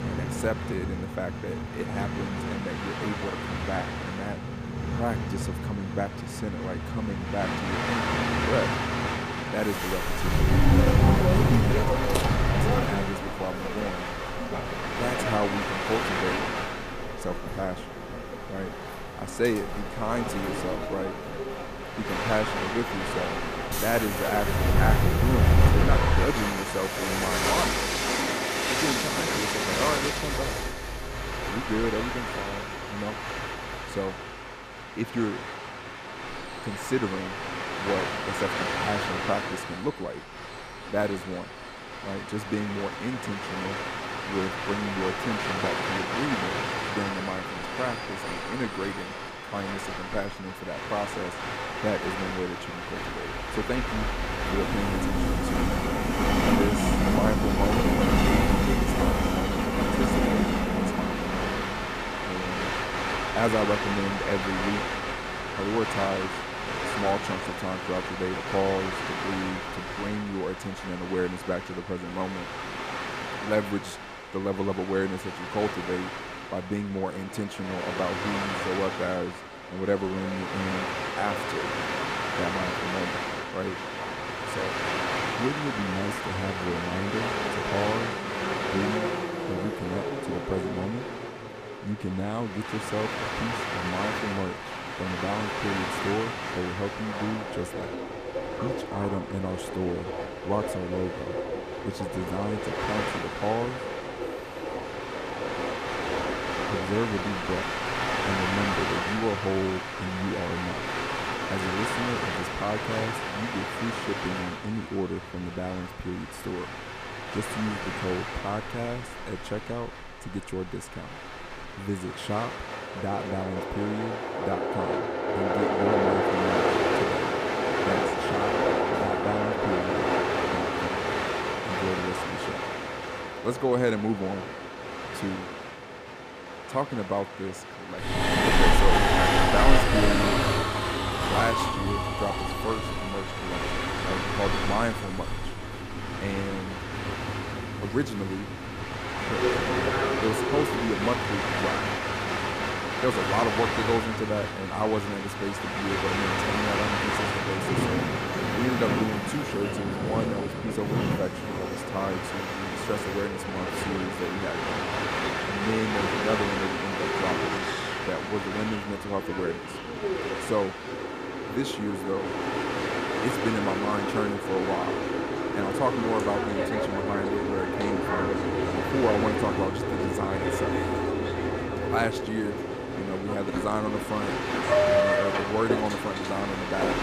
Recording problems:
train or aircraft noise; very loud; throughout; 3 dB above the speech

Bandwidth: 14.5 kHz